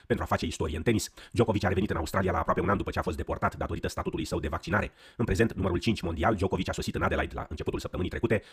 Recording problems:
wrong speed, natural pitch; too fast; 1.8 times normal speed

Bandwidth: 15 kHz